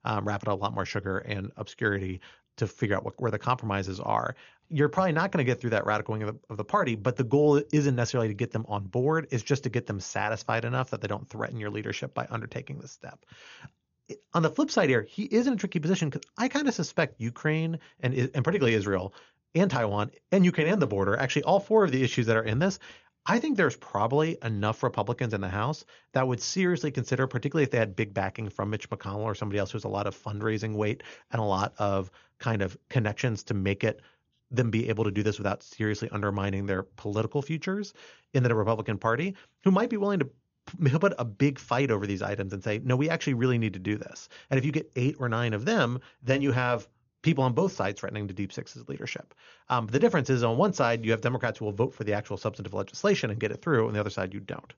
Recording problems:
high frequencies cut off; noticeable; nothing above 7 kHz

